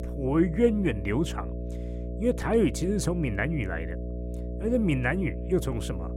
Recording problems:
electrical hum; noticeable; throughout; 60 Hz, 15 dB below the speech

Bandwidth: 16 kHz